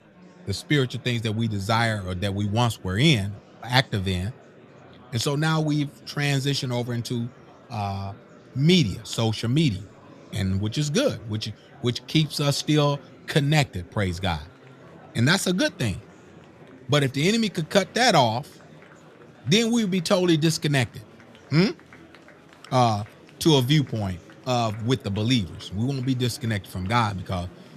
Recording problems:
murmuring crowd; faint; throughout; 25 dB below the speech

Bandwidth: 14.5 kHz